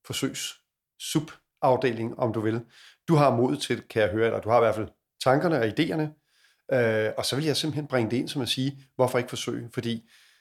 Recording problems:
none

